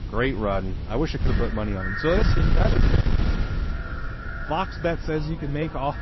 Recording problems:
echo of what is said; strong; from 1.5 s on; 530 ms later, 10 dB below the speech
distortion; slight; 8% of the sound clipped
garbled, watery; slightly; nothing above 5.5 kHz
wind noise on the microphone; heavy; 9 dB below the speech

